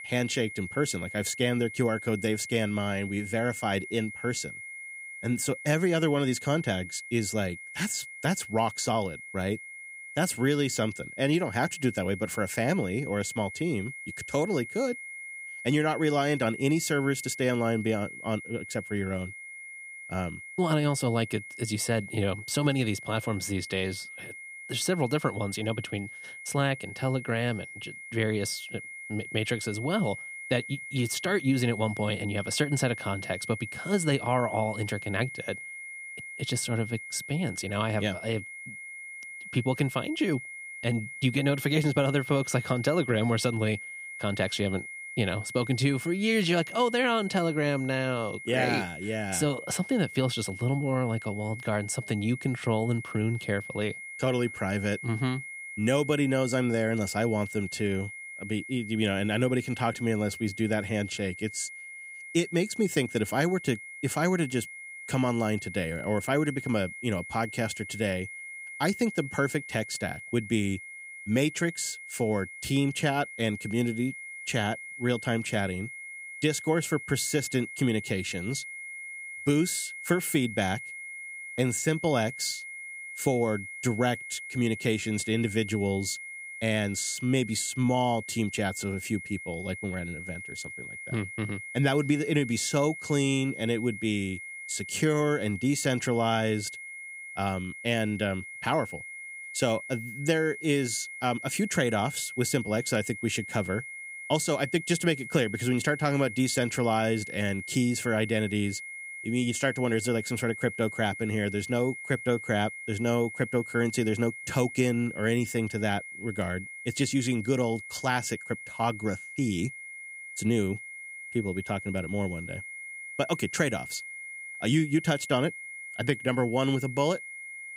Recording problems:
high-pitched whine; noticeable; throughout; 2 kHz, 10 dB below the speech

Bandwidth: 15.5 kHz